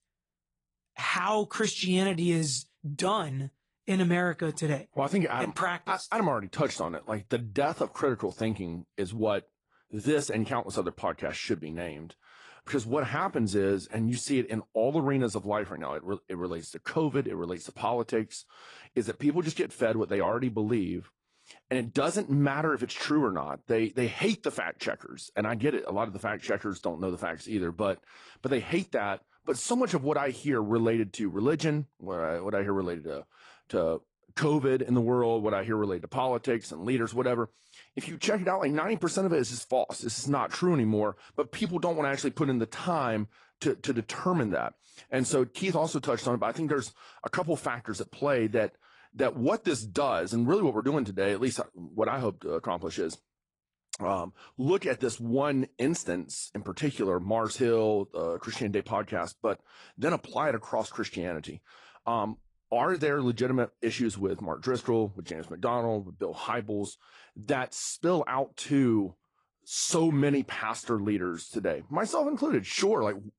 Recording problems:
garbled, watery; slightly; nothing above 10.5 kHz

